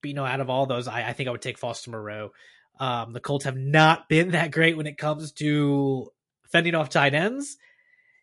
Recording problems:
garbled, watery; slightly; nothing above 11 kHz

